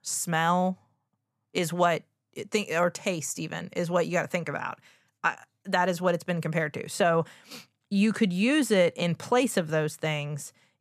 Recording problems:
none

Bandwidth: 14.5 kHz